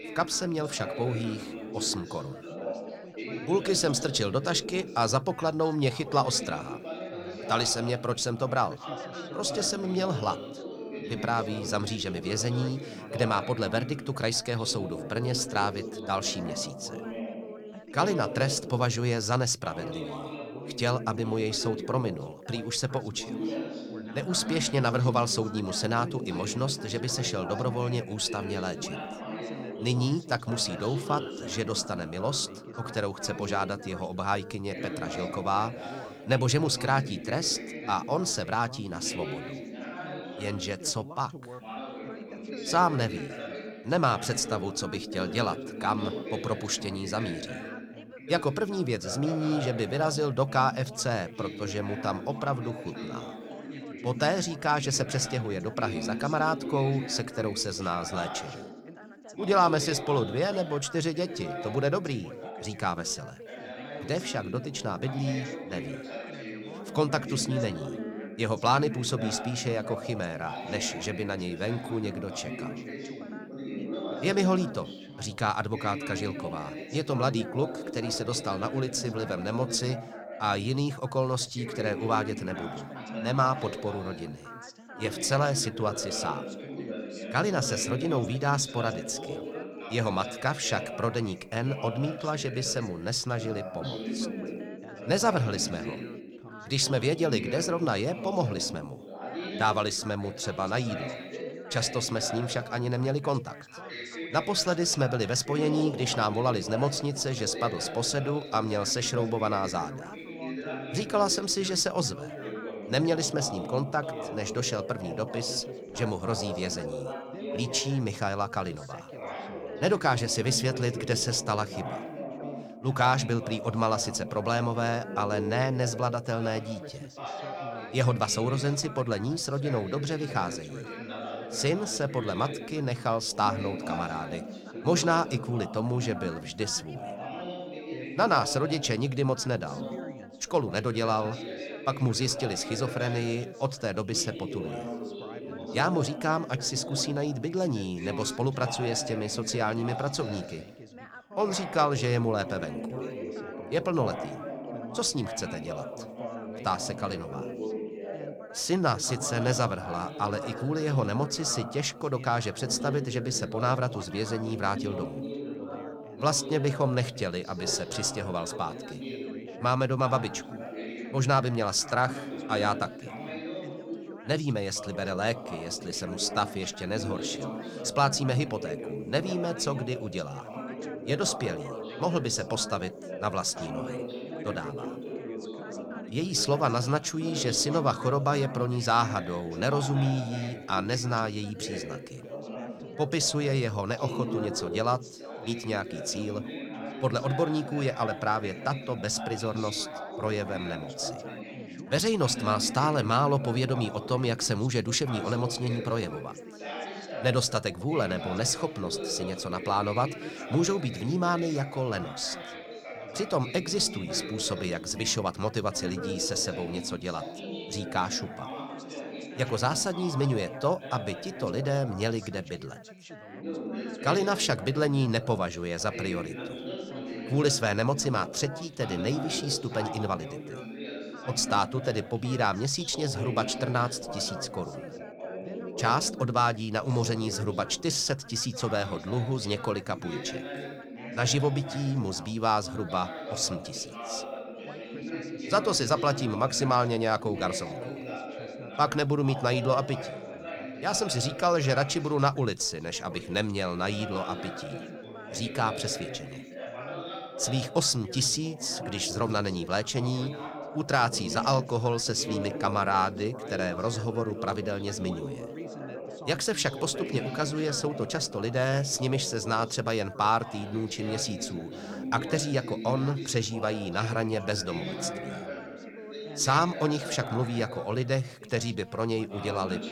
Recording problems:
background chatter; loud; throughout; 3 voices, 9 dB below the speech

